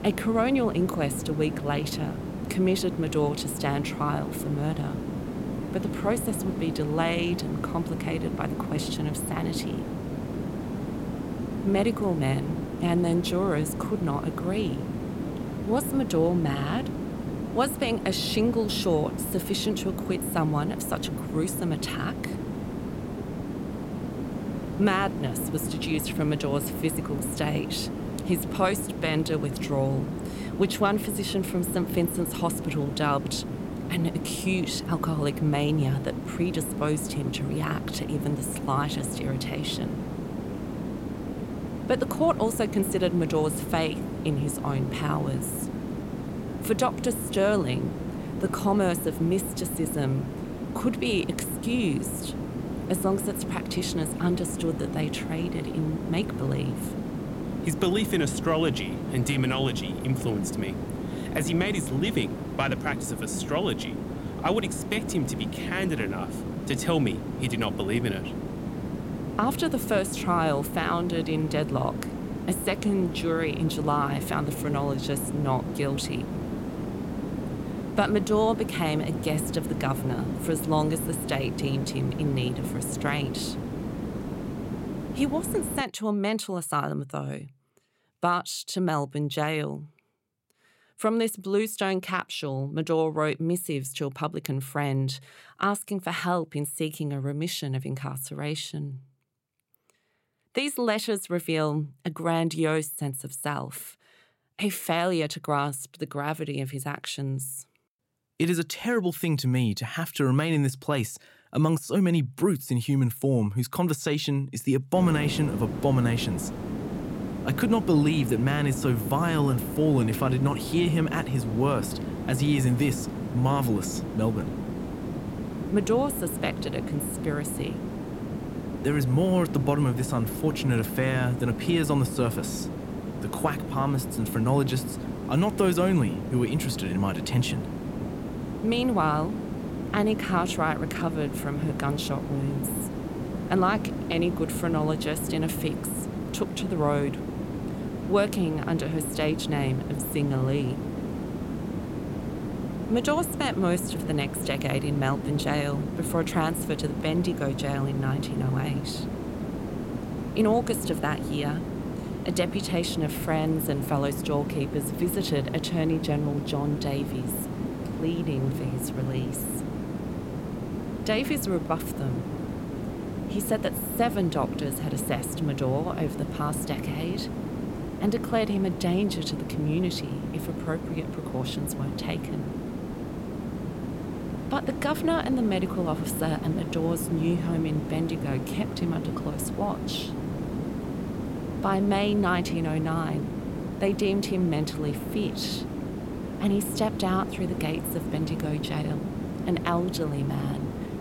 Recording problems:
hiss; loud; until 1:26 and from 1:55 on; 5 dB below the speech

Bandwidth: 16.5 kHz